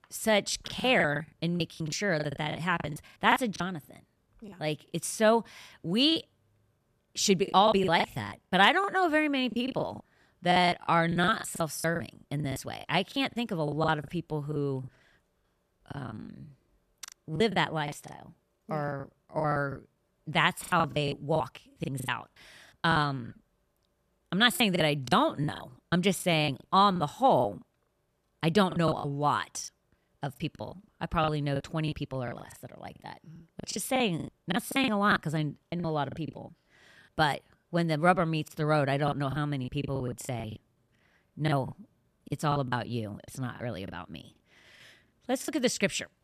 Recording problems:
choppy; very; 15% of the speech affected

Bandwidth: 14 kHz